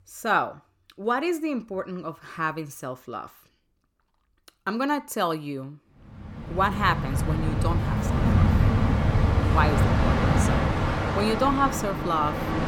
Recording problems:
train or aircraft noise; very loud; from 6.5 s on; 4 dB above the speech

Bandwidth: 17.5 kHz